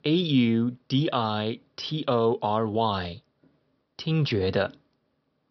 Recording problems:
high frequencies cut off; noticeable; nothing above 5.5 kHz

